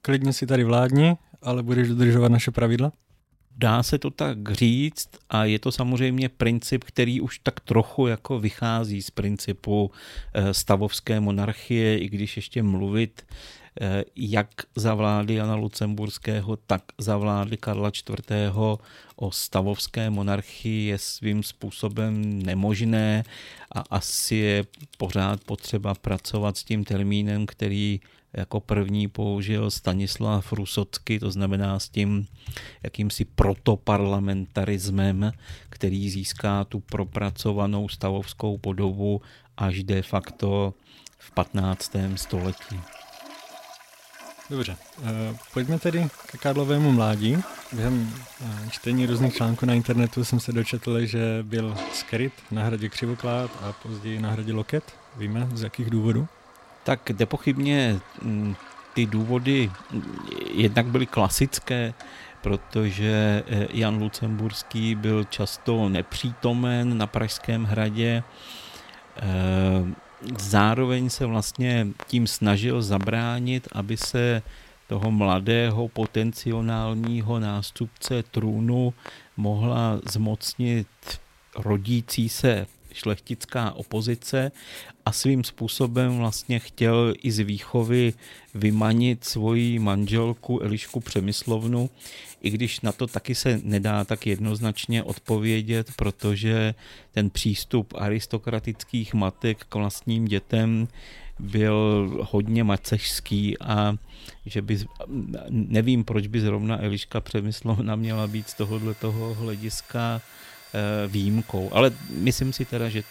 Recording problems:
household noises; faint; throughout; 20 dB below the speech

